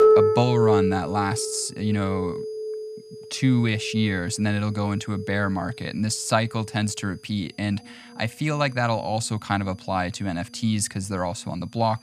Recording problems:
background music; loud; throughout; 2 dB below the speech
high-pitched whine; faint; throughout; 5 kHz, 30 dB below the speech

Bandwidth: 14.5 kHz